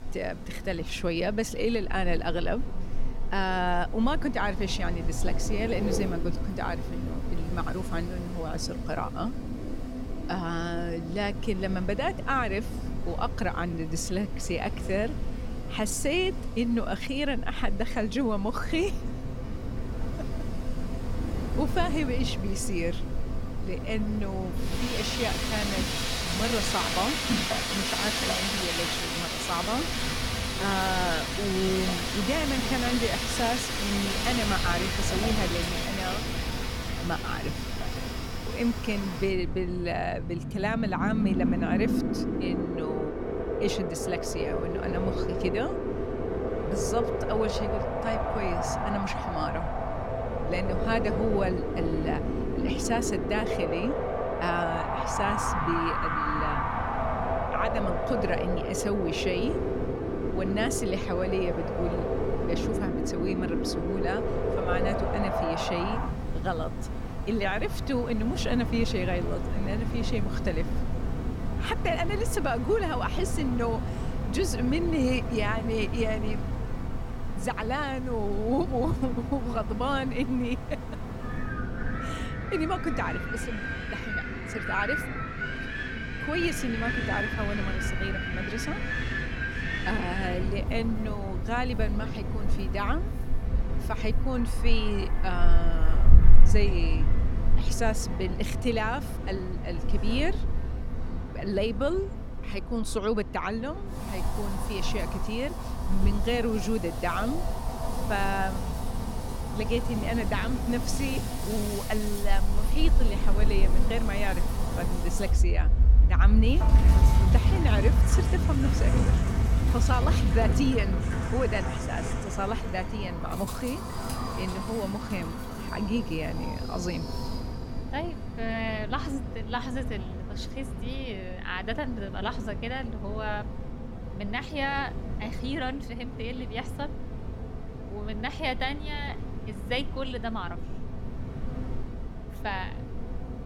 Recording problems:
wind in the background; very loud; throughout; 1 dB above the speech

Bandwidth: 17 kHz